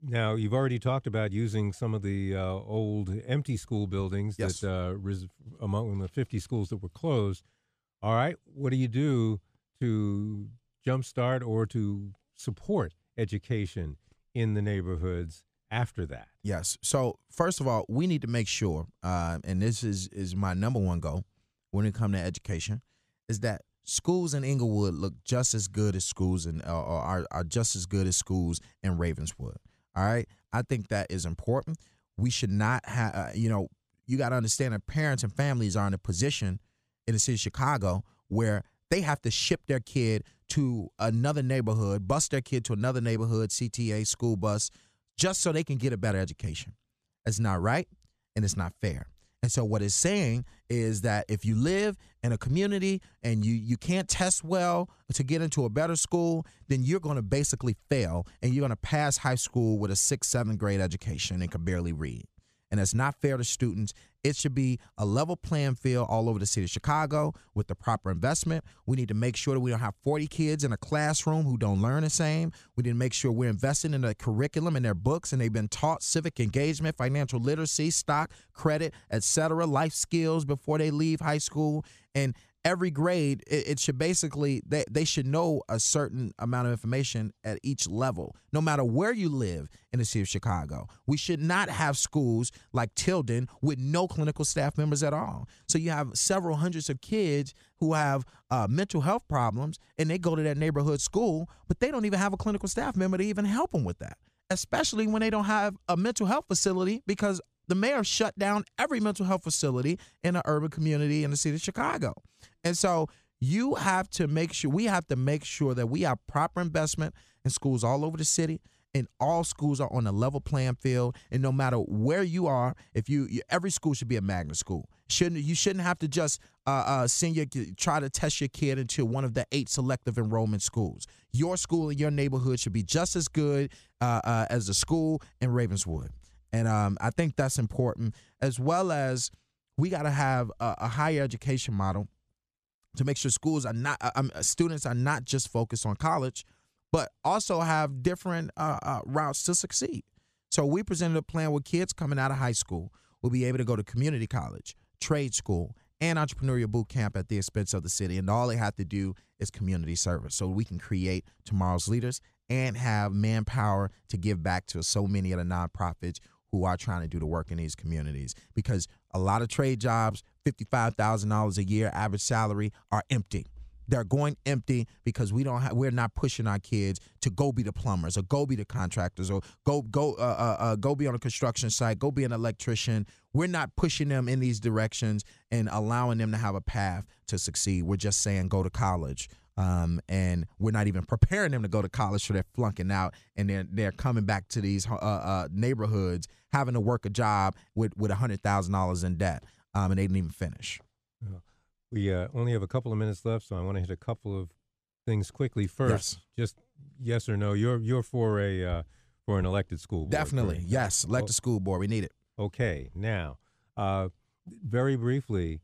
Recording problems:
none

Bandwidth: 14.5 kHz